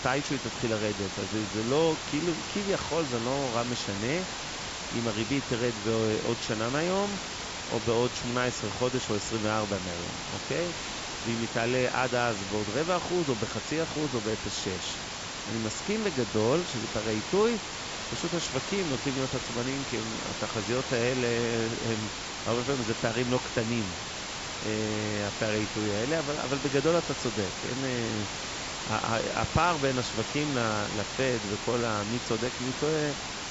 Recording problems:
high frequencies cut off; noticeable; nothing above 8 kHz
hiss; loud; throughout; 4 dB below the speech

